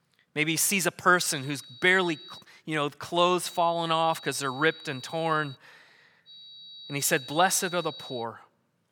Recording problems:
high-pitched whine; noticeable; from 1.5 to 2.5 s, from 3.5 to 5.5 s and from 6.5 to 8 s; 4 kHz, 15 dB below the speech

